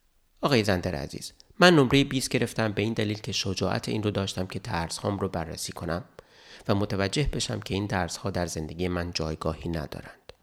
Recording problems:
none

